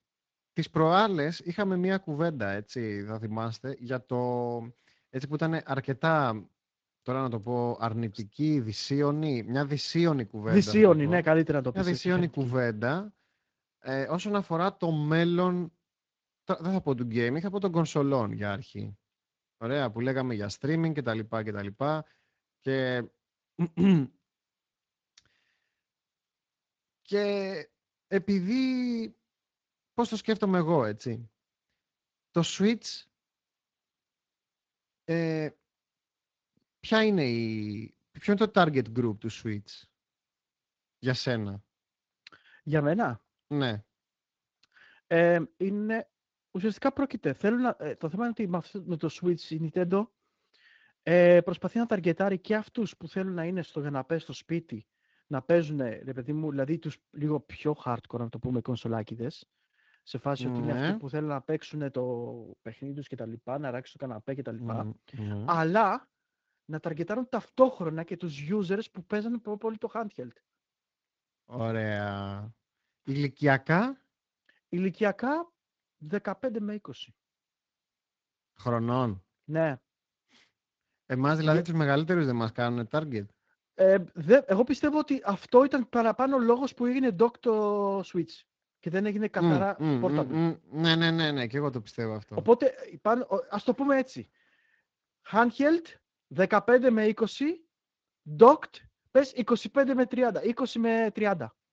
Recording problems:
garbled, watery; slightly

